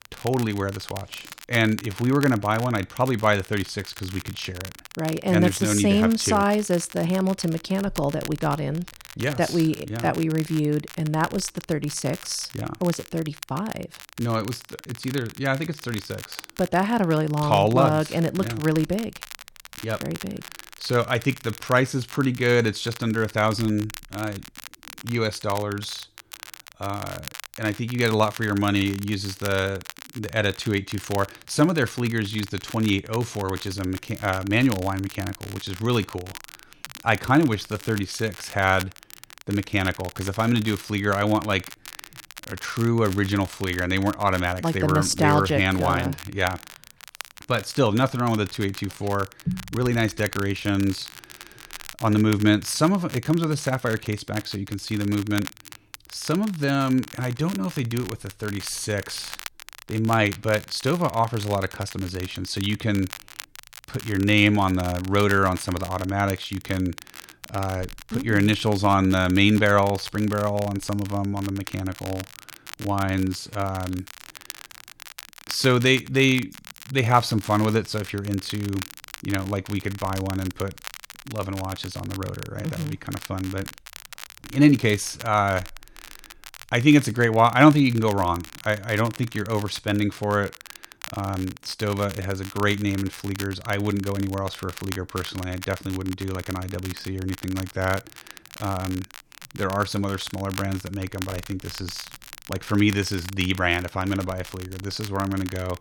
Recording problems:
crackle, like an old record; noticeable; 15 dB below the speech

